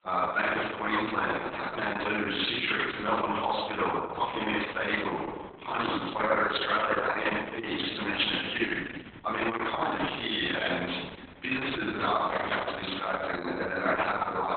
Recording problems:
off-mic speech; far
garbled, watery; badly; nothing above 4 kHz
room echo; noticeable; dies away in 1.4 s
thin; somewhat; fading below 850 Hz

